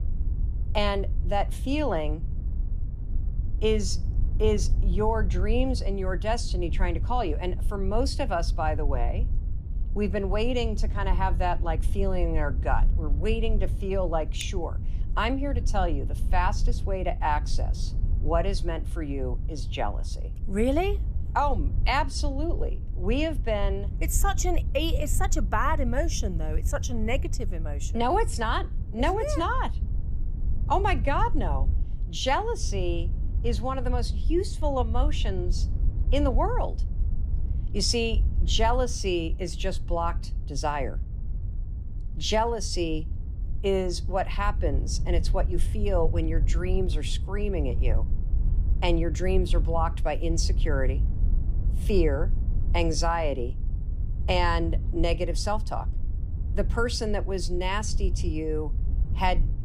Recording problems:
wind noise on the microphone; occasional gusts; 20 dB below the speech

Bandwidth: 14.5 kHz